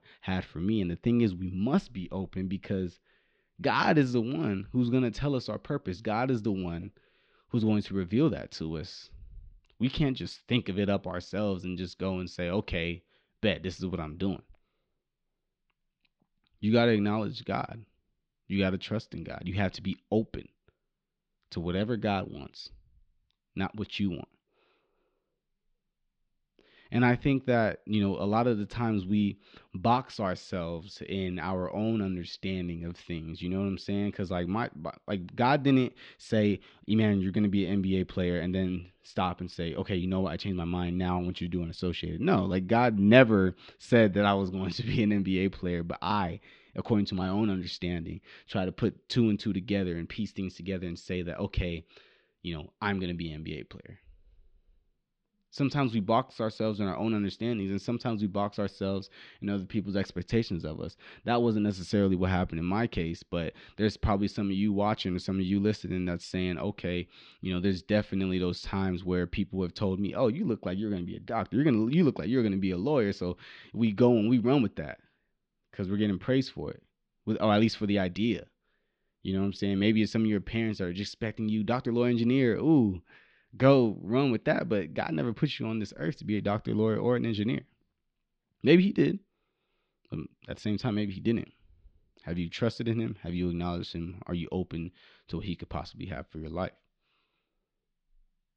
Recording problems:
muffled; slightly; fading above 4 kHz

